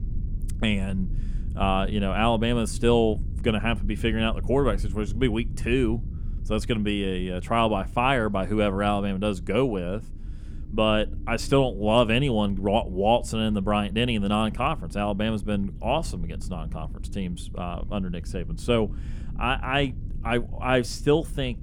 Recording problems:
low rumble; faint; throughout; 25 dB below the speech

